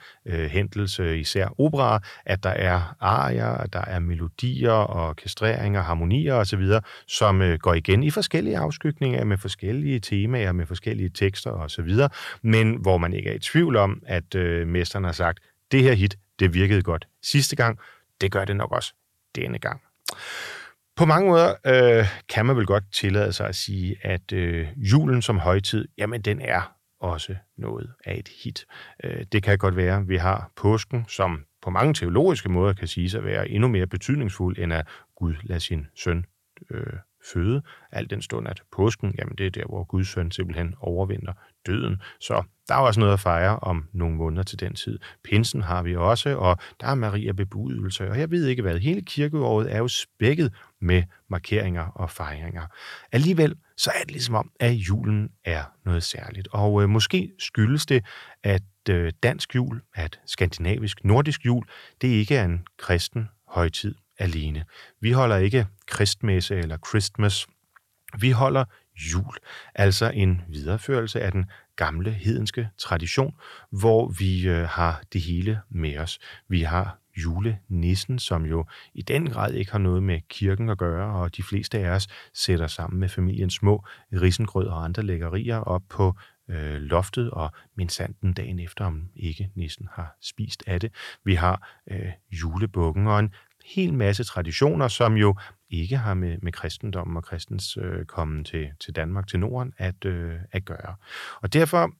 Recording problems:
none

